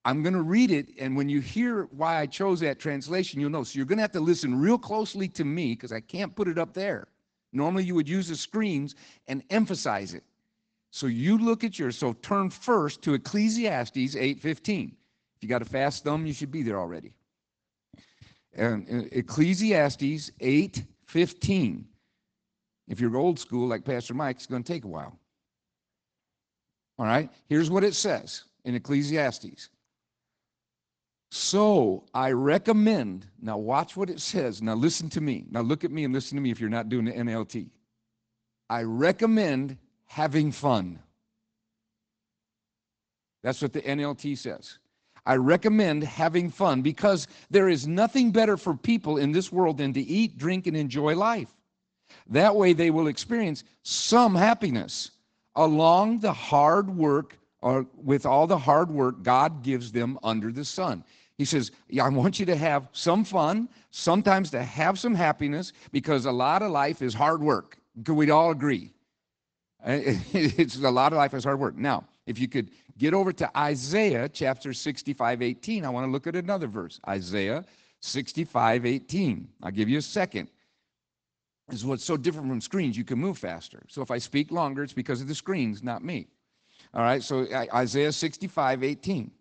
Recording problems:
high frequencies cut off; noticeable; nothing above 8 kHz
garbled, watery; slightly

